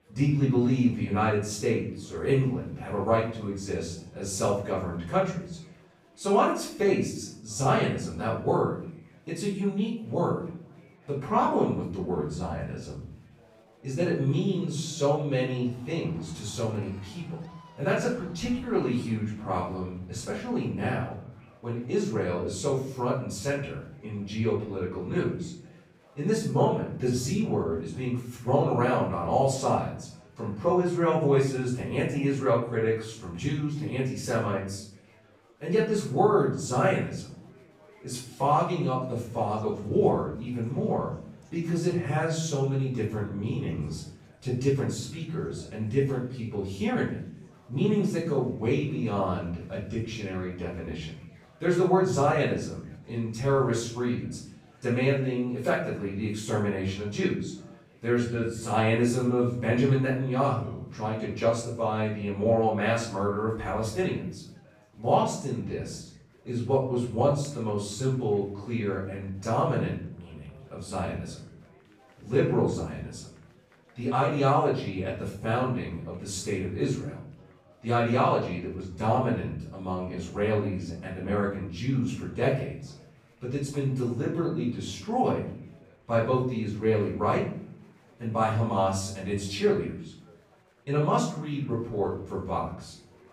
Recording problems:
off-mic speech; far
room echo; noticeable; dies away in 0.7 s
chatter from many people; faint; throughout; 30 dB below the speech

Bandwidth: 15.5 kHz